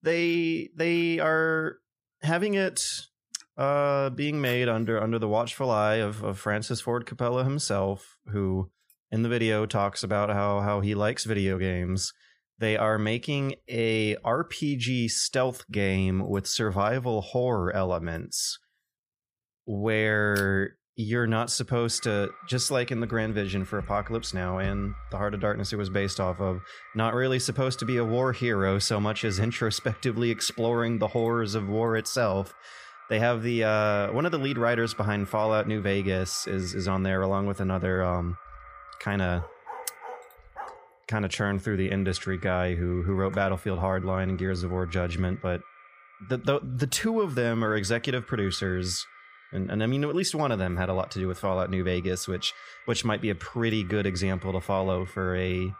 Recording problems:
echo of what is said; faint; from 22 s on; 220 ms later, 20 dB below the speech
dog barking; faint; from 39 to 41 s; peak 15 dB below the speech

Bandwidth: 15 kHz